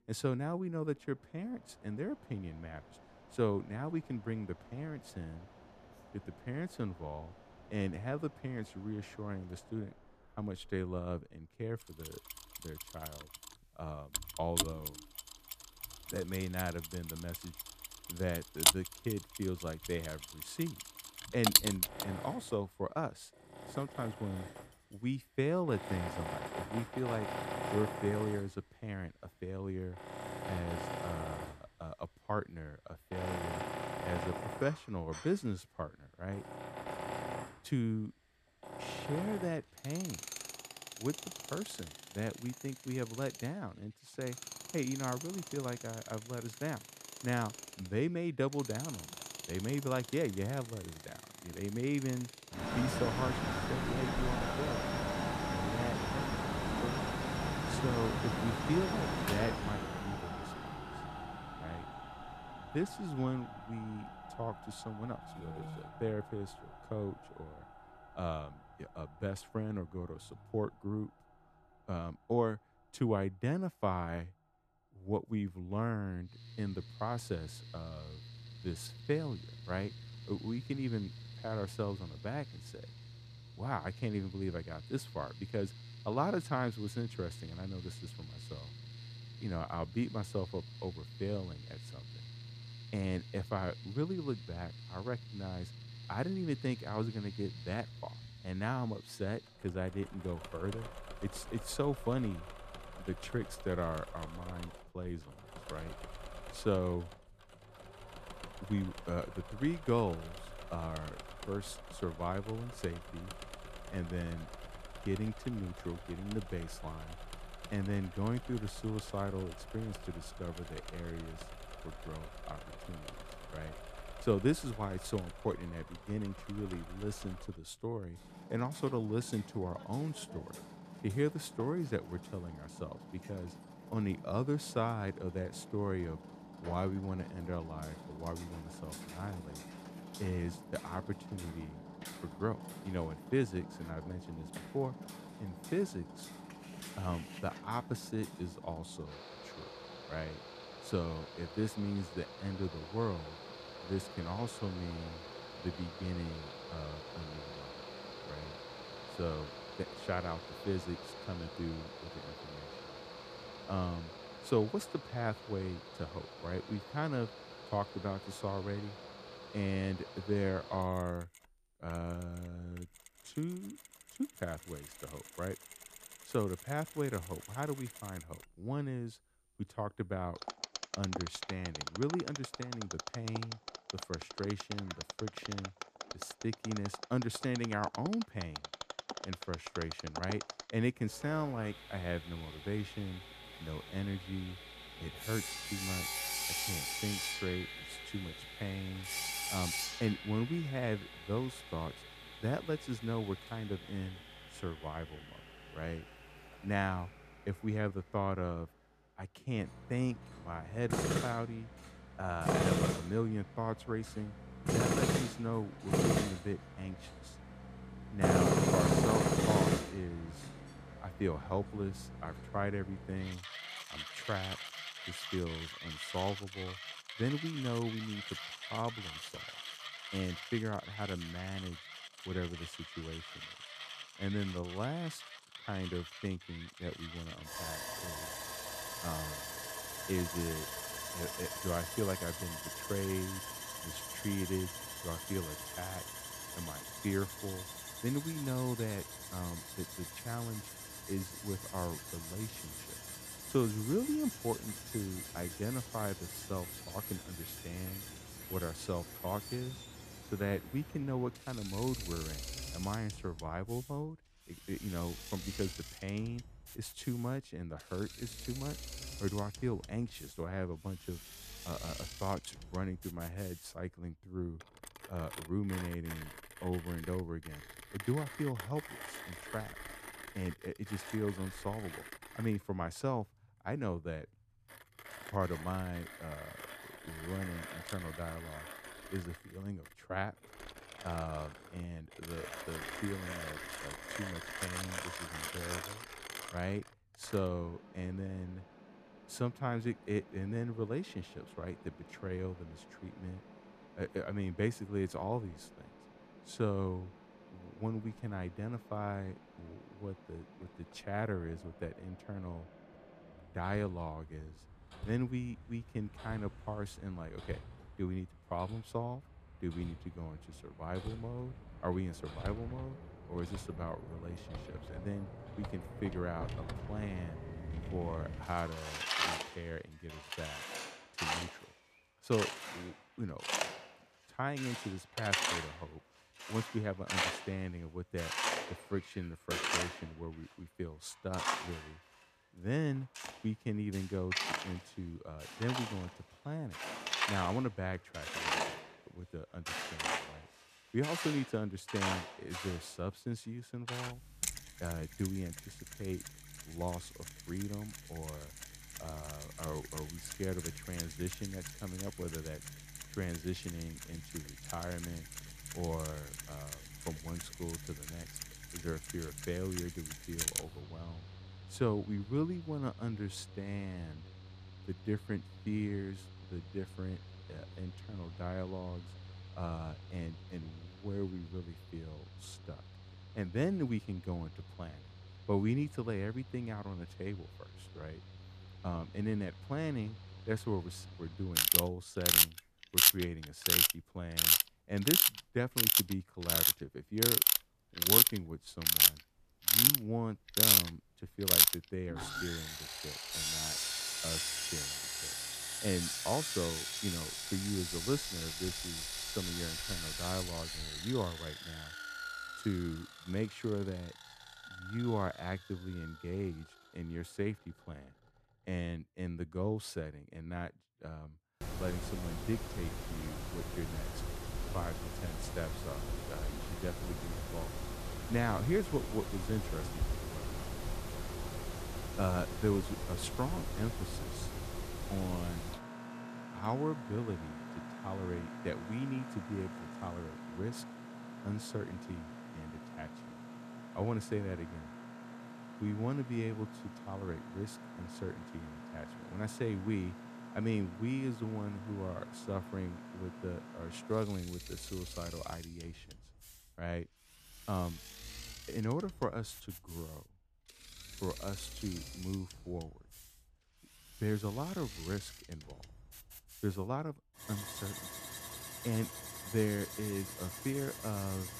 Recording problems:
machinery noise; very loud; throughout; 1 dB above the speech

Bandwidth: 14.5 kHz